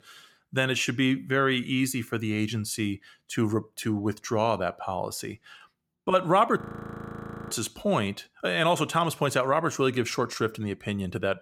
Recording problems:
audio freezing; at 6.5 s for 1 s

